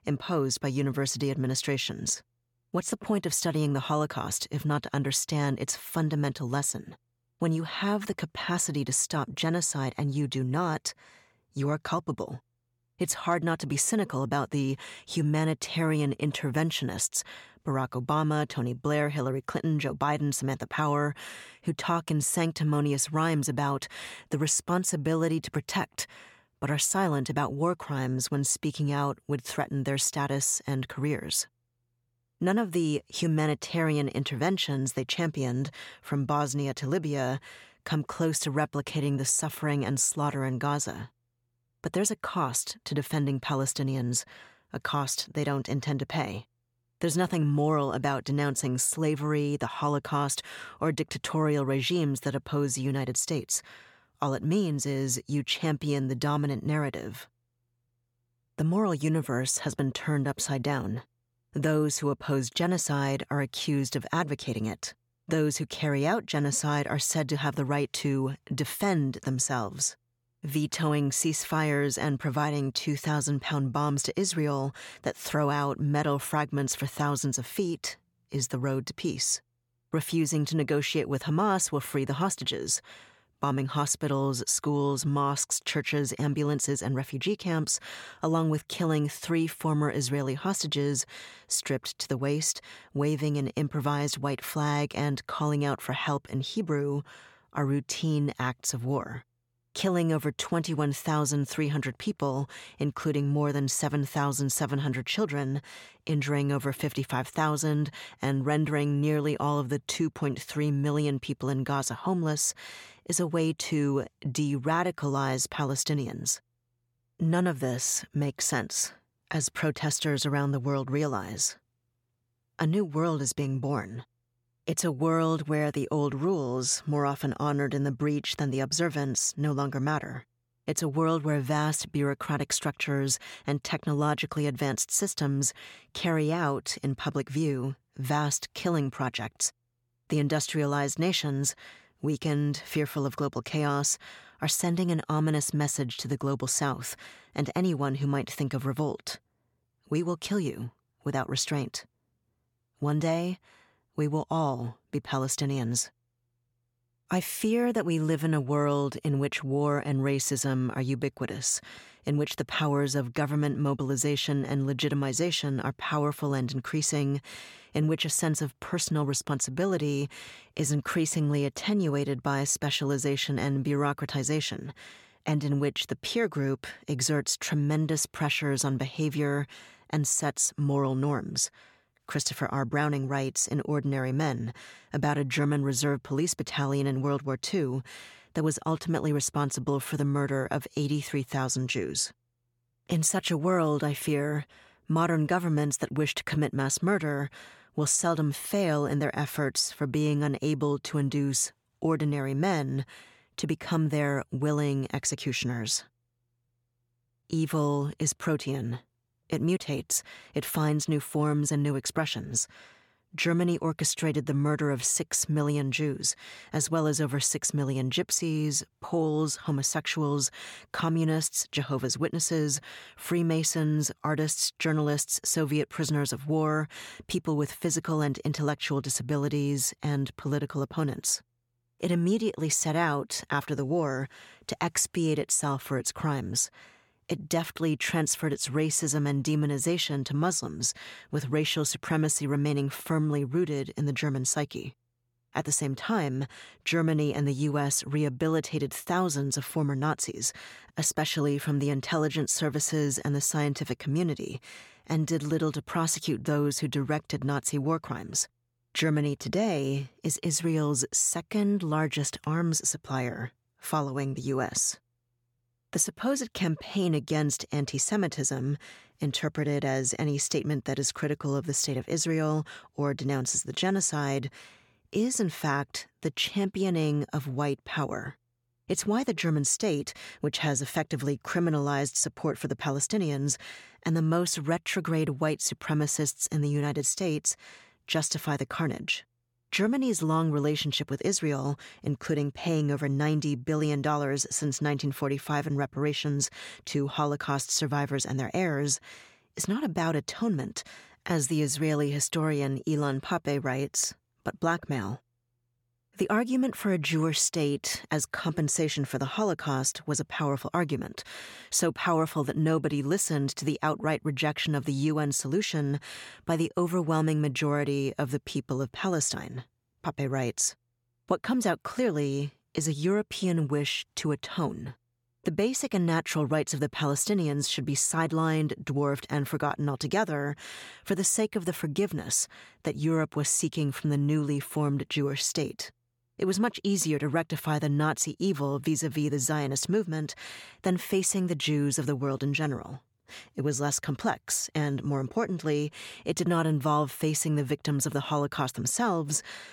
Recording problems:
none

